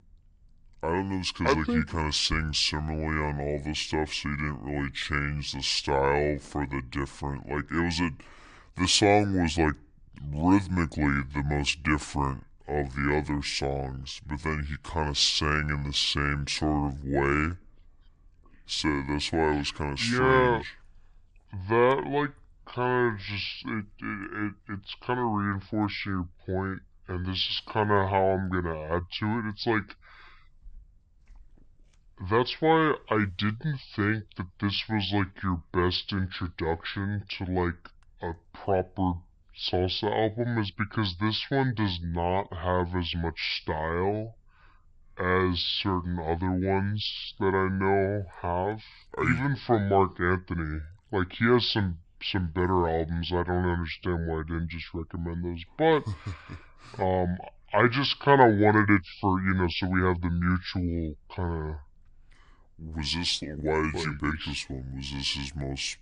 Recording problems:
wrong speed and pitch; too slow and too low; 0.7 times normal speed

